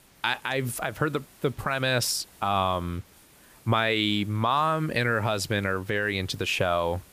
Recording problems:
hiss; faint; throughout; 25 dB below the speech

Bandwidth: 15 kHz